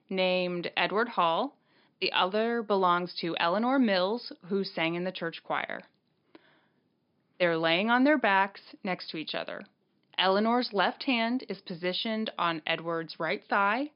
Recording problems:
high frequencies cut off; noticeable; nothing above 5 kHz

